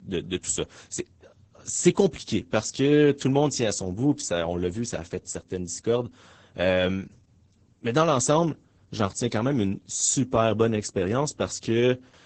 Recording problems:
garbled, watery; badly; nothing above 8 kHz

